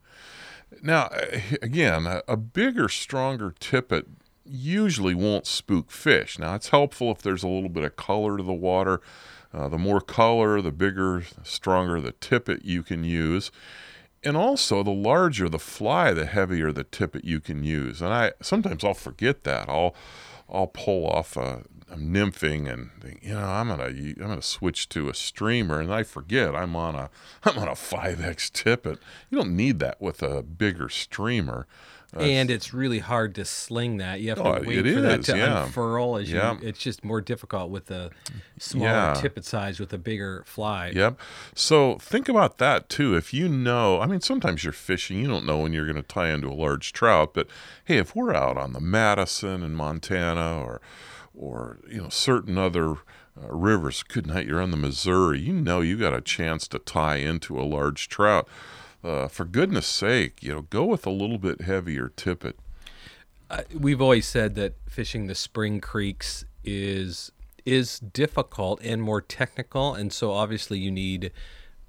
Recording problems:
none

